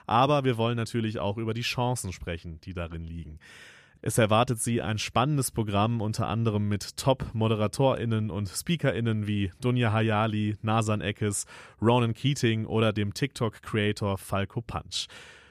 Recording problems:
none

